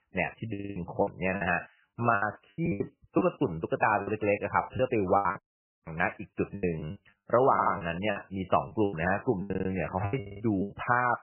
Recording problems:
garbled, watery; badly; nothing above 3 kHz
choppy; very; 16% of the speech affected
audio stuttering; 4 times, first at 0.5 s
audio cutting out; at 5.5 s for 0.5 s

